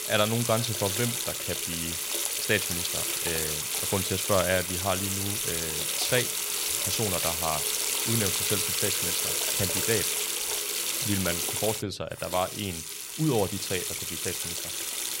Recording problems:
household noises; very loud; throughout; 3 dB above the speech

